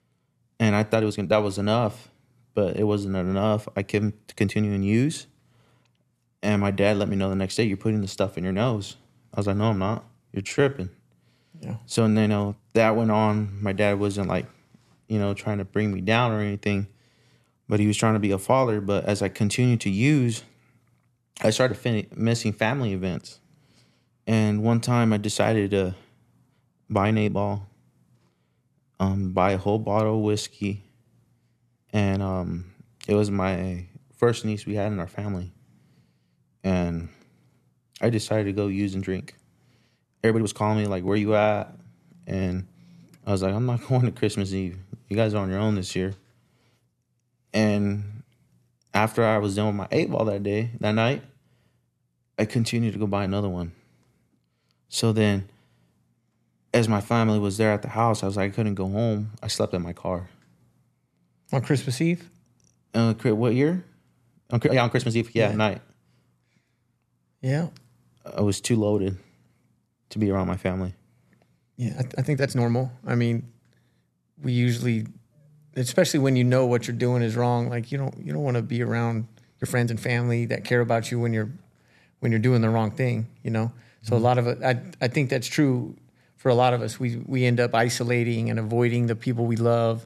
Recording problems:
uneven, jittery; strongly; from 1 s to 1:20

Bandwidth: 13.5 kHz